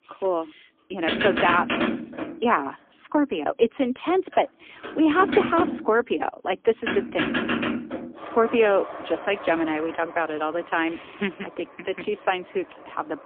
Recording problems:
phone-call audio; poor line; nothing above 3.5 kHz
traffic noise; loud; throughout; 4 dB below the speech

